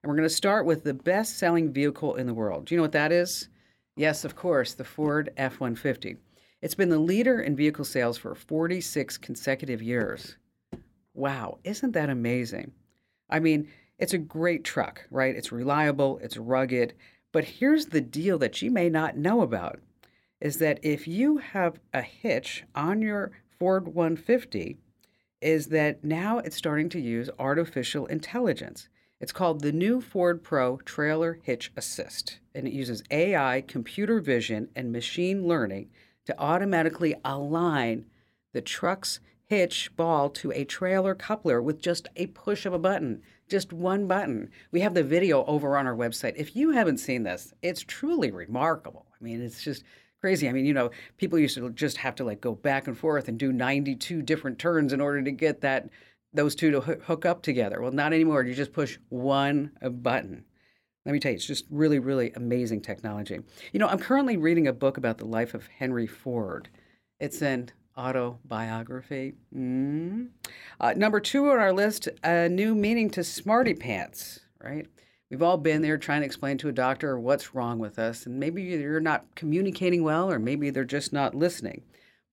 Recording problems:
none

